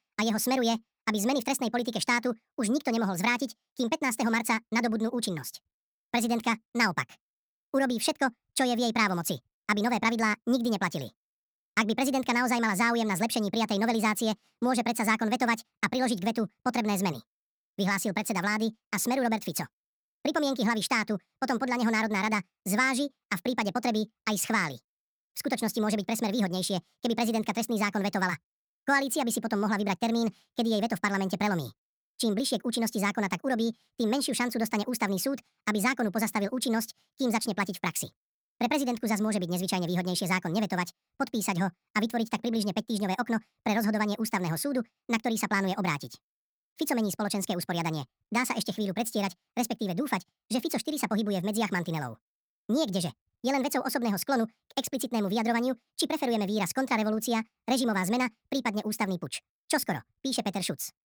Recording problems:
wrong speed and pitch; too fast and too high; 1.6 times normal speed

